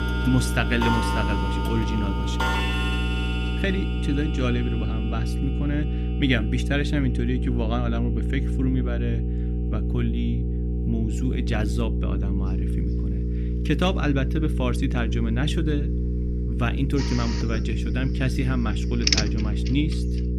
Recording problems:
electrical hum; loud; throughout; 60 Hz, 7 dB below the speech
household noises; loud; throughout; 2 dB below the speech

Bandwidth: 14.5 kHz